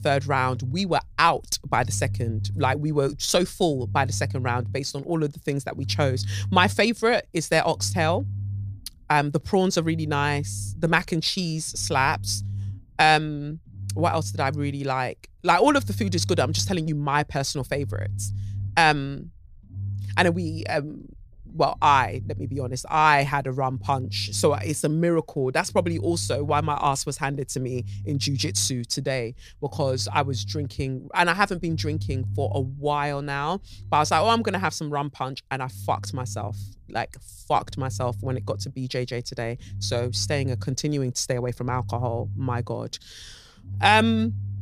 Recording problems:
low rumble; faint; throughout; 25 dB below the speech

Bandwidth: 15 kHz